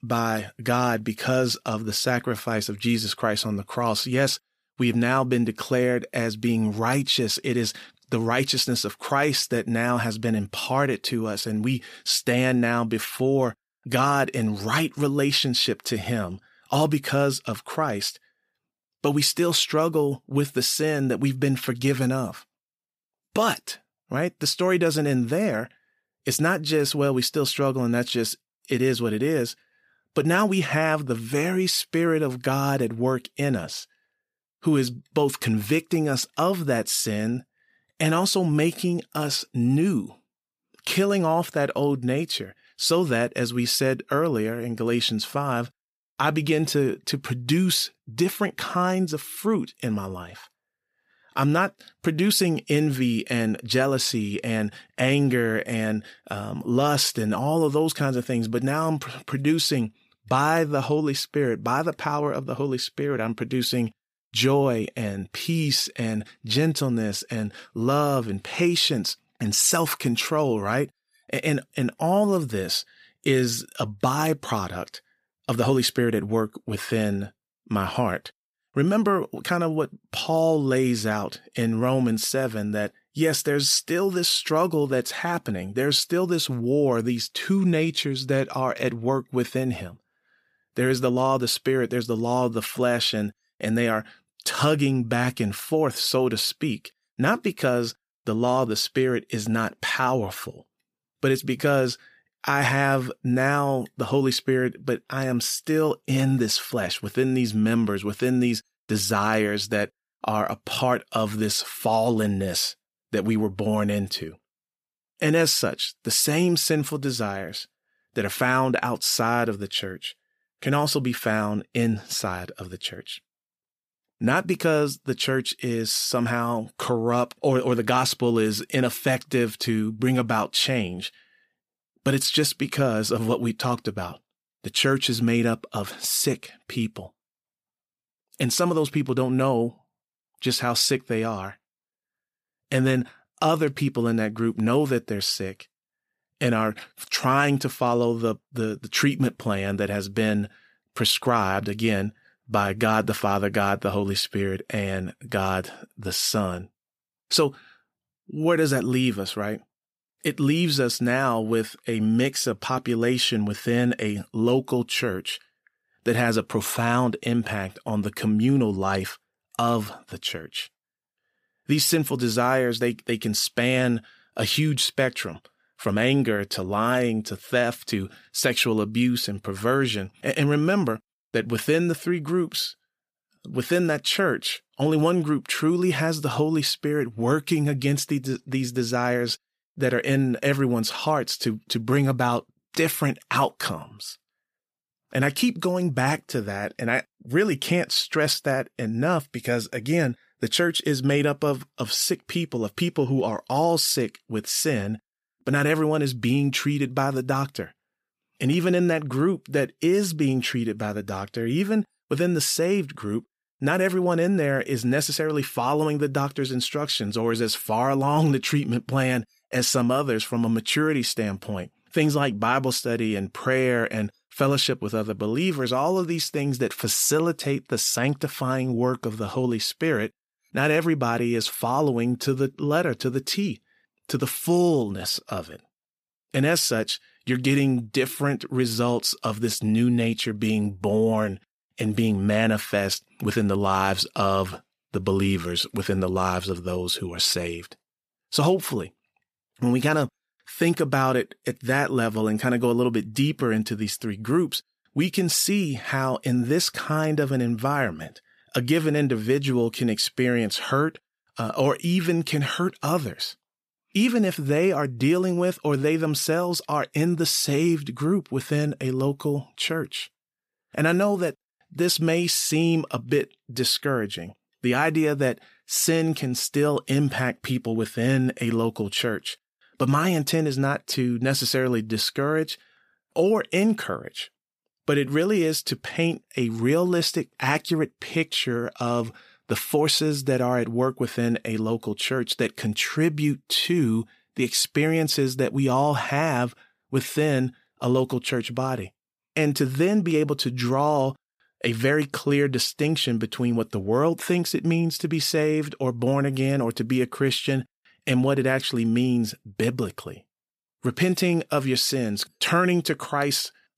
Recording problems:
none

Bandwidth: 15 kHz